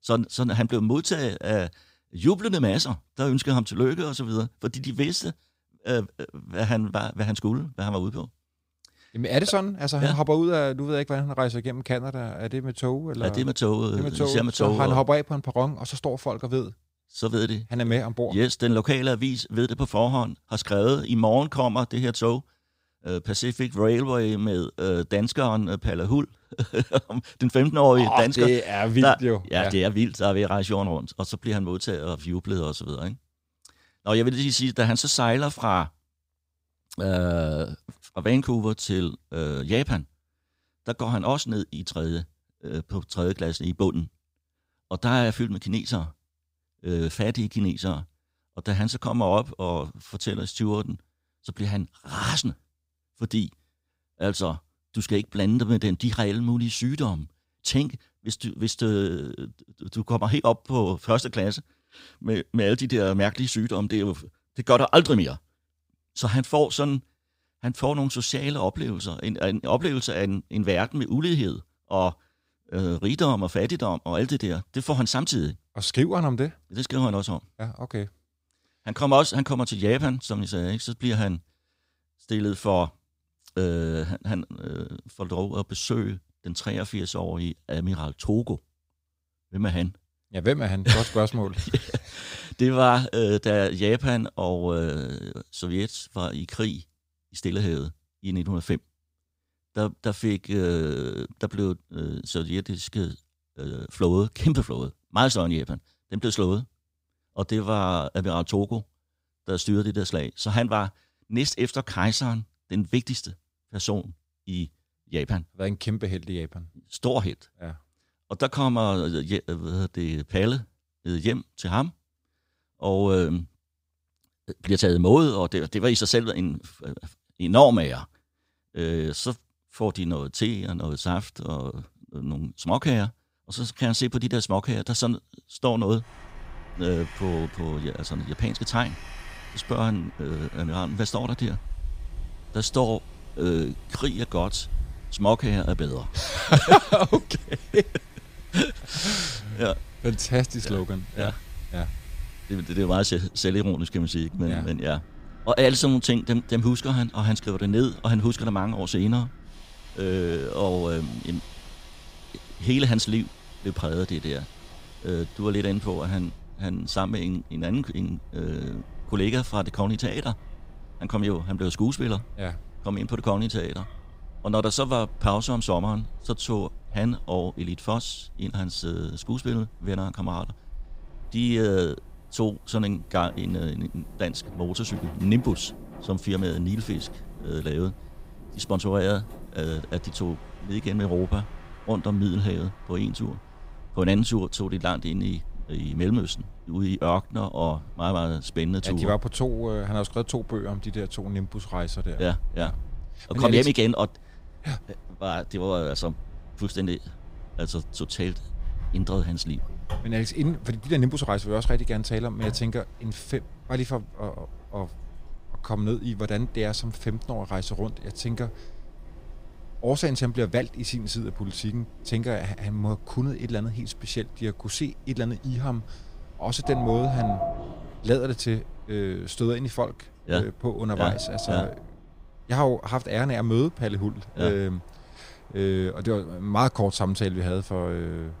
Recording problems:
wind in the background; noticeable; from 2:16 on; 15 dB below the speech

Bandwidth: 15.5 kHz